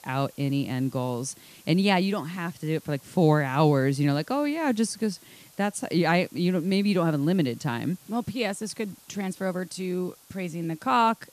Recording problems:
hiss; faint; throughout; 25 dB below the speech

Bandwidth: 14.5 kHz